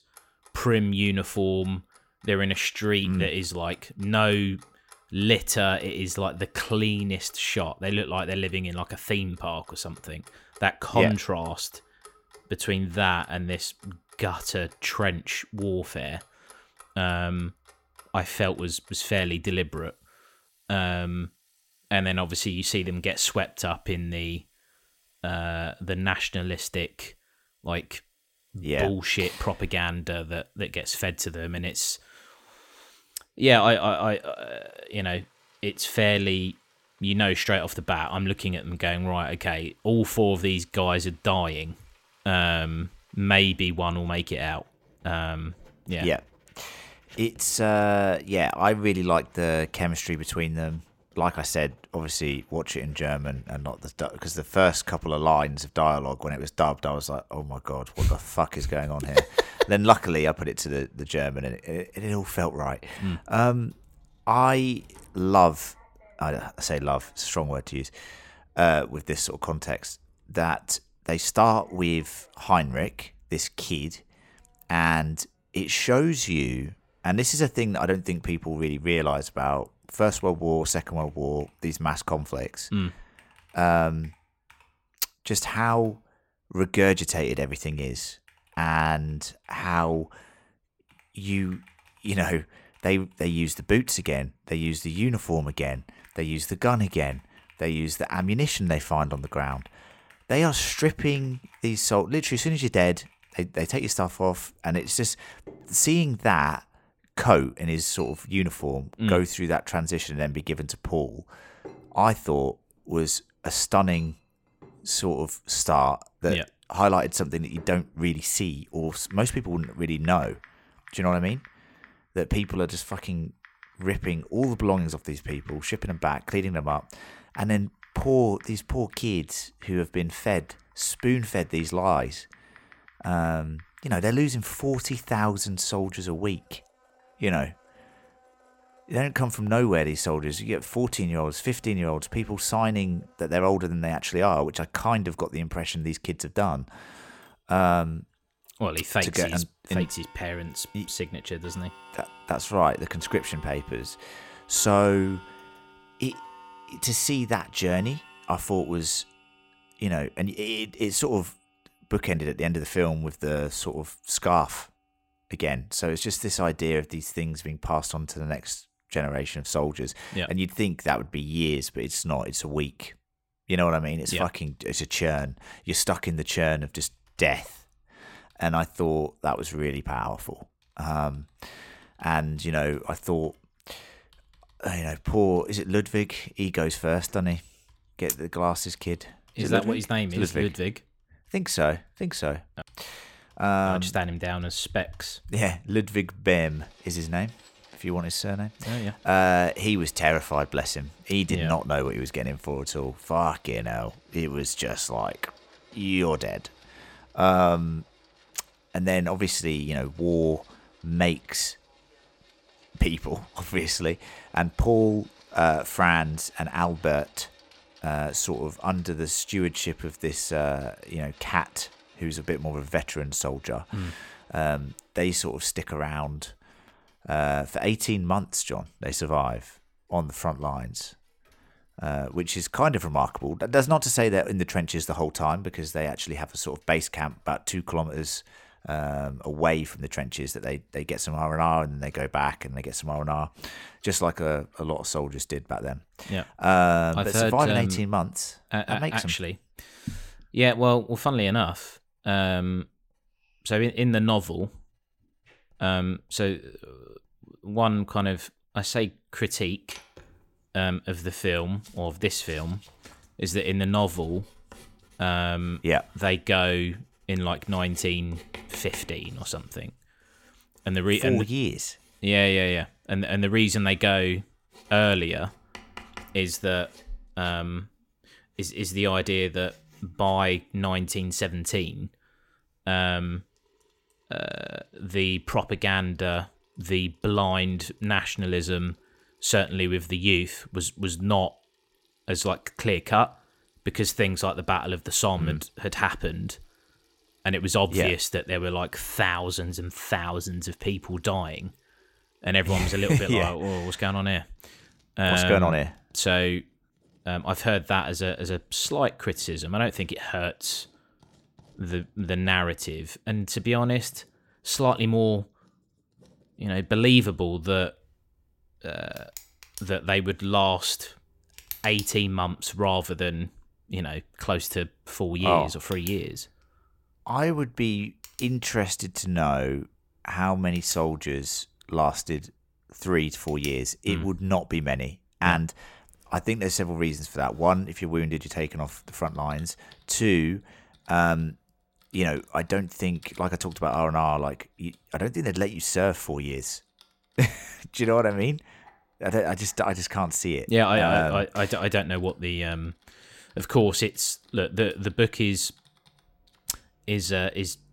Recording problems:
household noises; faint; throughout; 25 dB below the speech

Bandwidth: 16.5 kHz